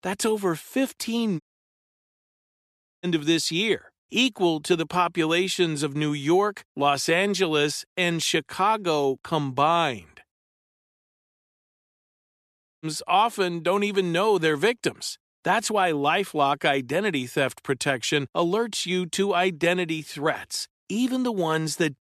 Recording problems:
audio cutting out; at 1.5 s for 1.5 s and at 10 s for 2.5 s

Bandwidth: 13.5 kHz